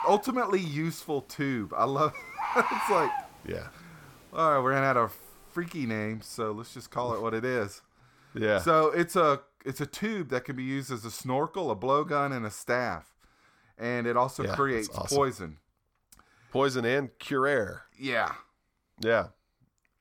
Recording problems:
animal sounds; loud; until 7.5 s; 3 dB below the speech

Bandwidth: 17.5 kHz